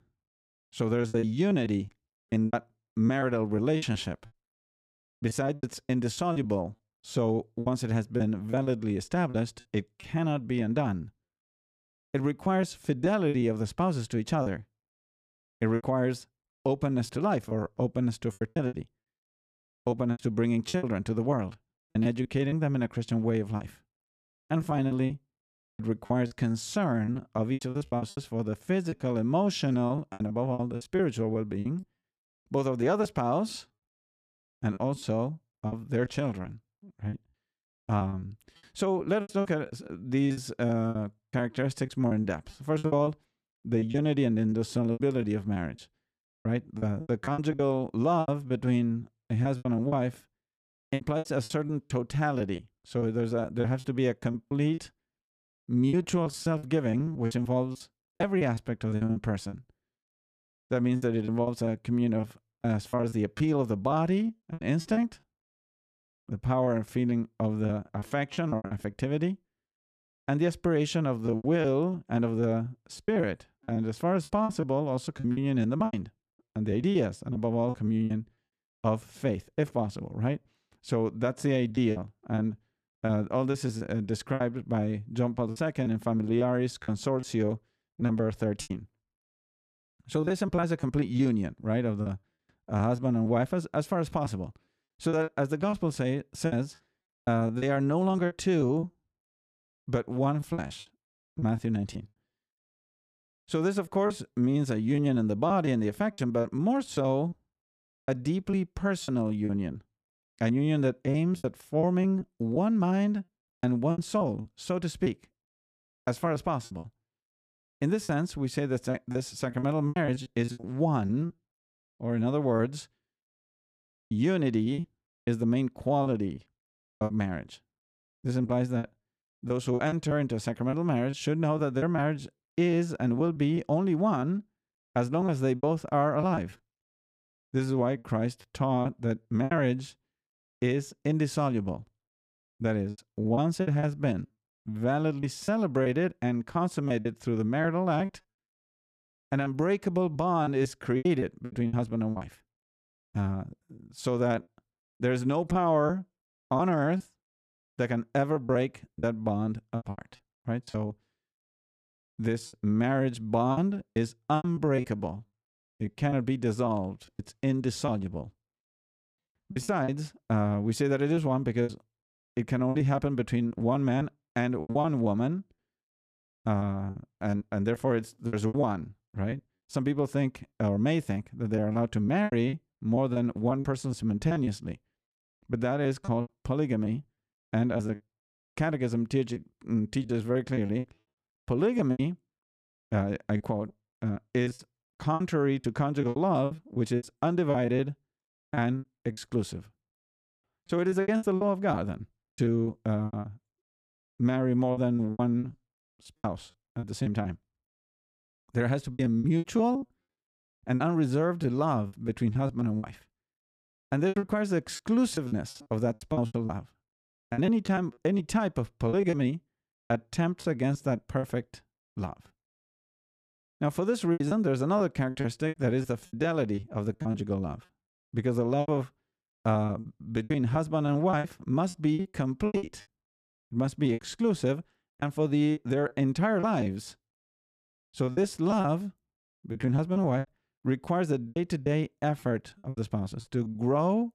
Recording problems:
choppy; very; 12% of the speech affected

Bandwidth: 14.5 kHz